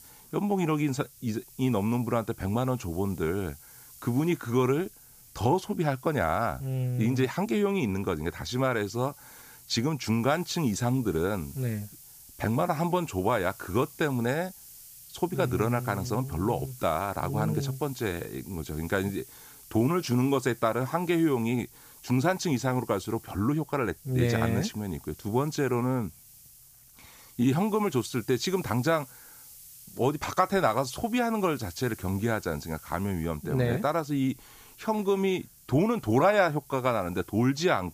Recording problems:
hiss; noticeable; throughout; 20 dB below the speech

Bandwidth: 15 kHz